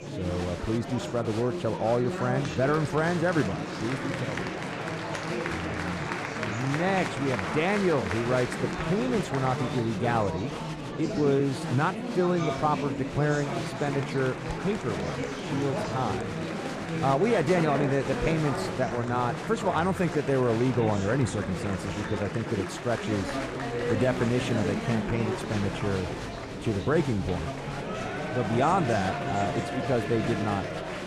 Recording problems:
murmuring crowd; loud; throughout; 4 dB below the speech

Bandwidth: 13.5 kHz